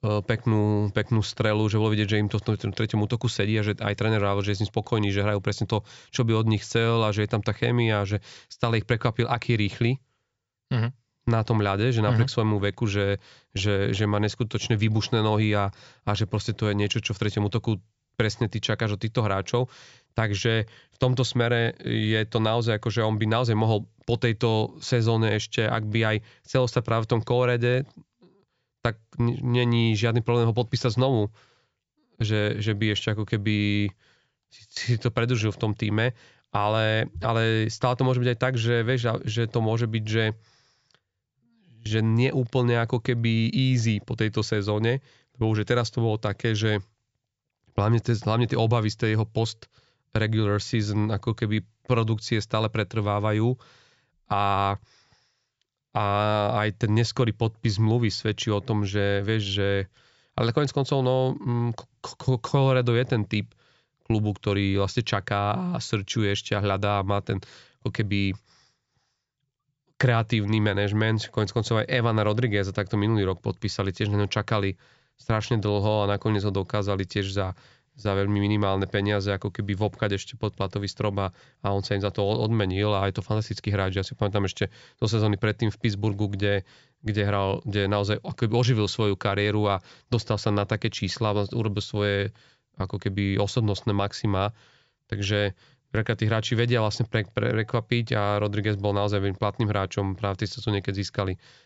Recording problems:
high frequencies cut off; noticeable; nothing above 8 kHz

